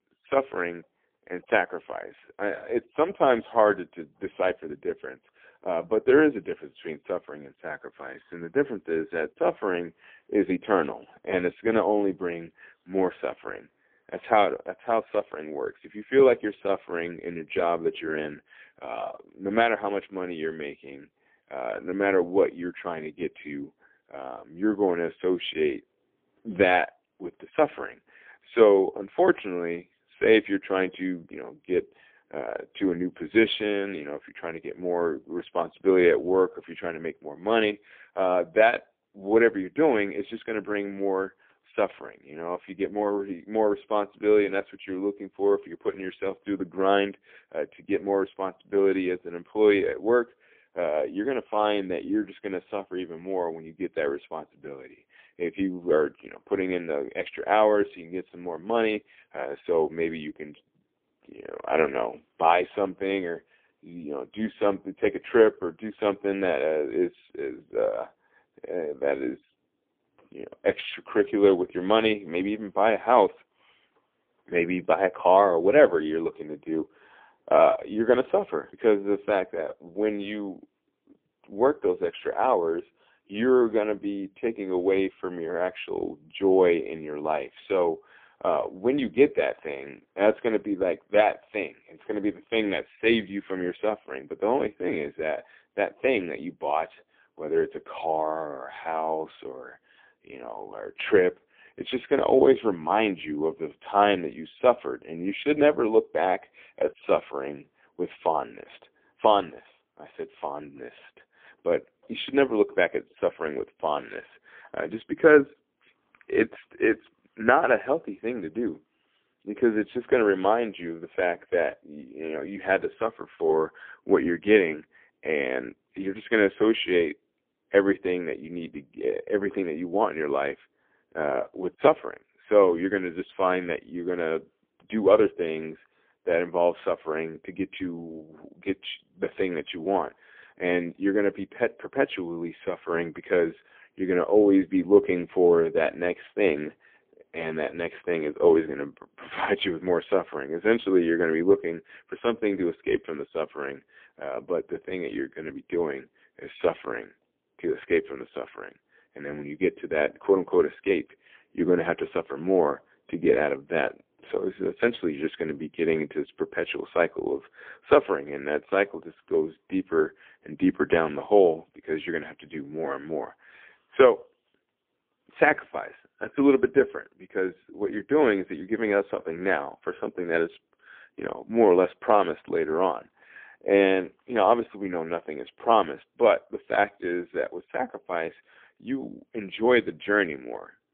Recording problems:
phone-call audio; poor line; nothing above 3.5 kHz

